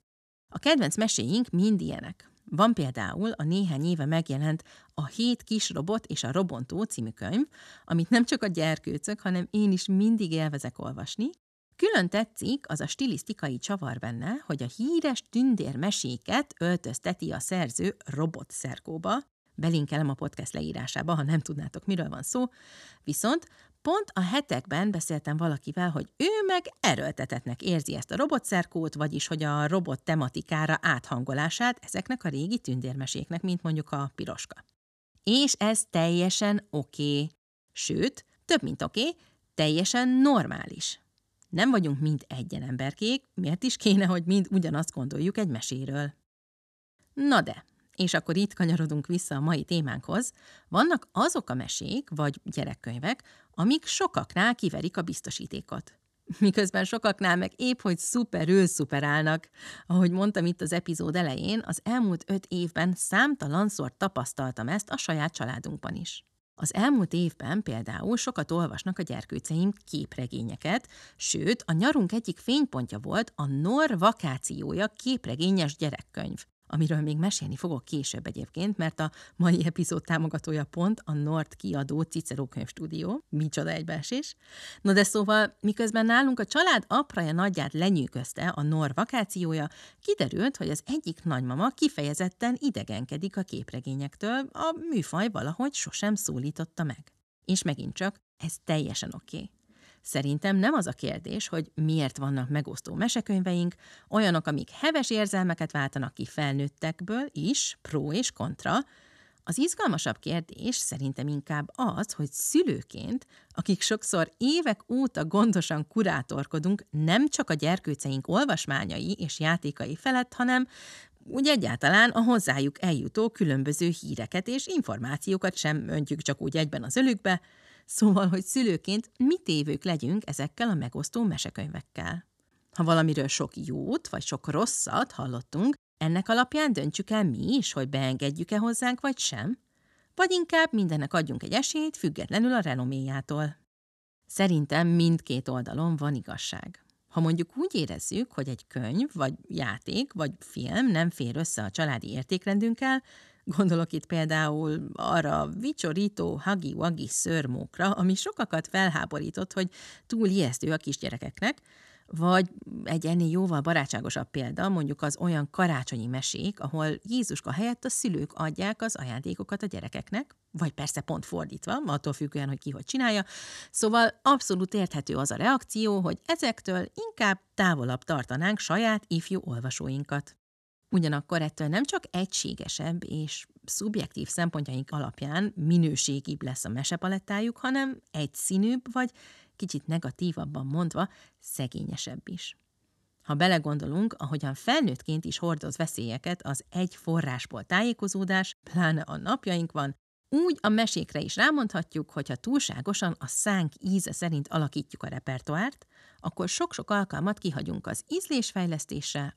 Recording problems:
none

